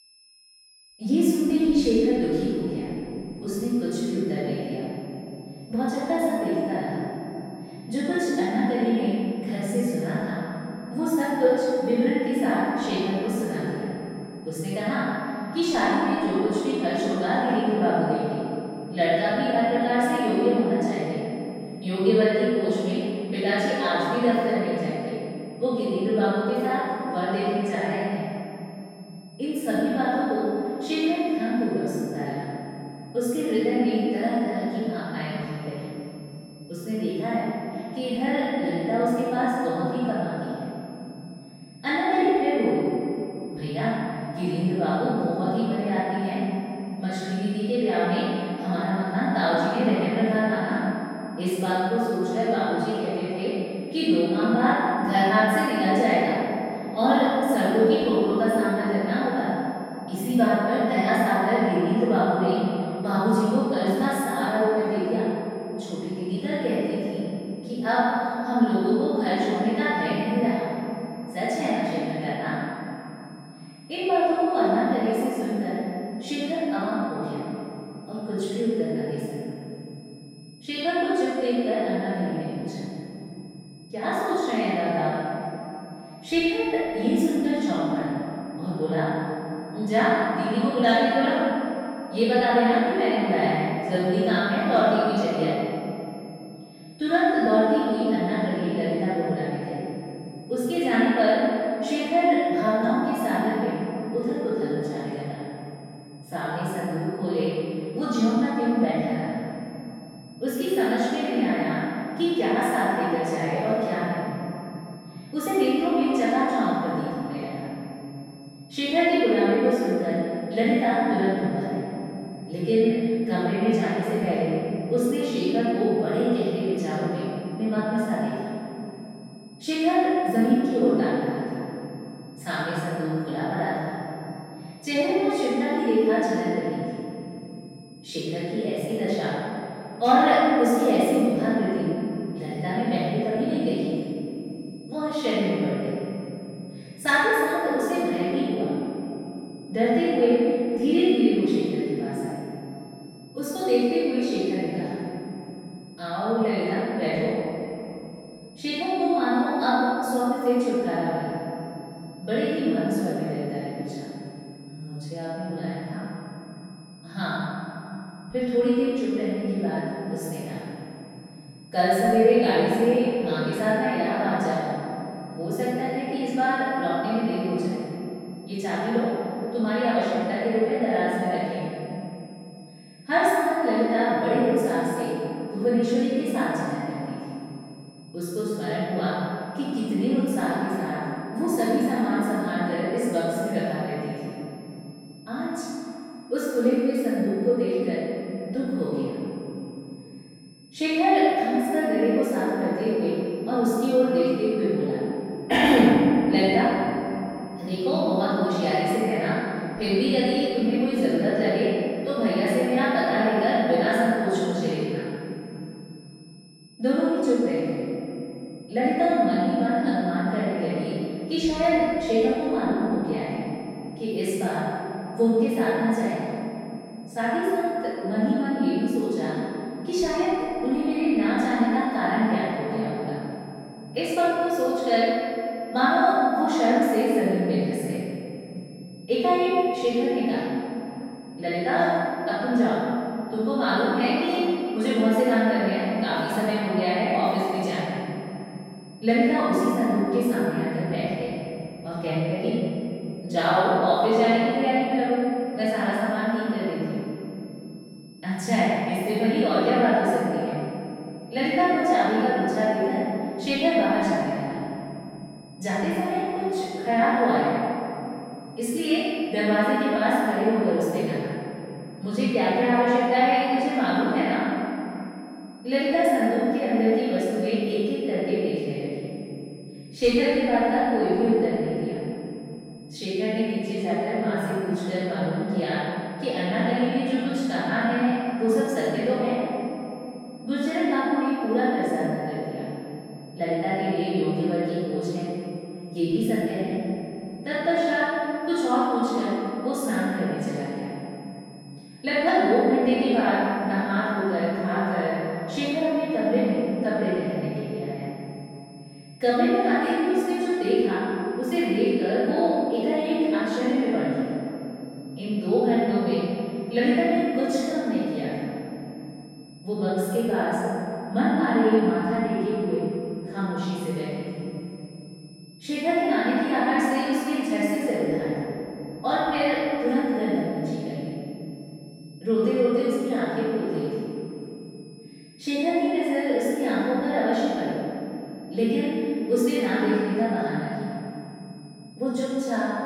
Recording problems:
room echo; strong; dies away in 3 s
off-mic speech; far
high-pitched whine; faint; throughout; 5 kHz, 30 dB below the speech

